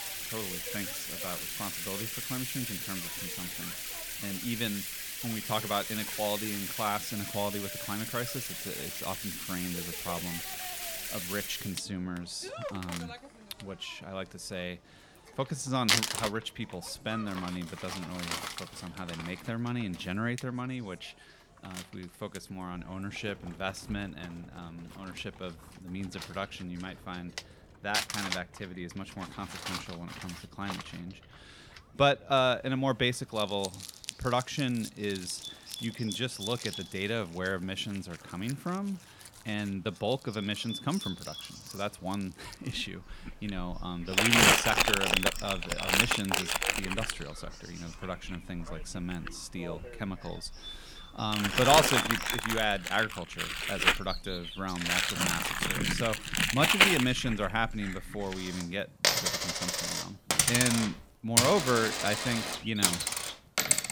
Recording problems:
household noises; very loud; throughout; 4 dB above the speech
animal sounds; noticeable; throughout; 10 dB below the speech

